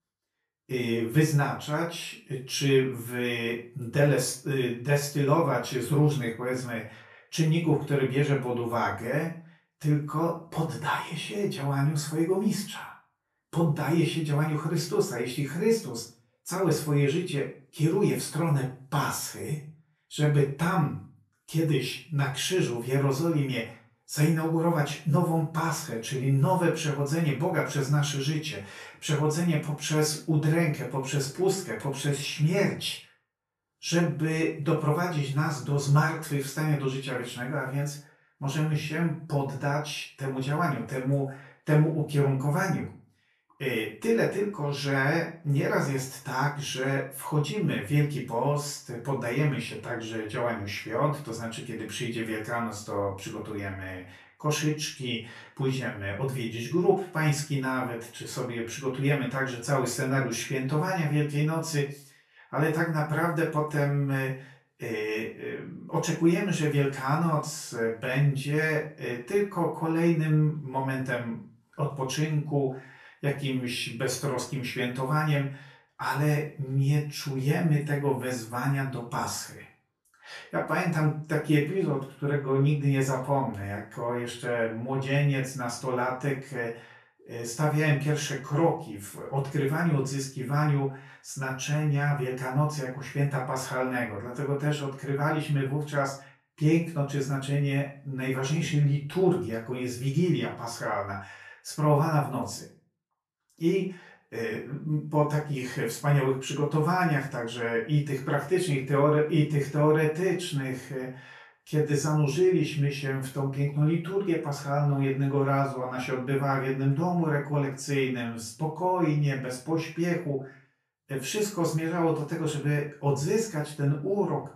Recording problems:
off-mic speech; far
room echo; slight; dies away in 0.3 s

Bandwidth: 13.5 kHz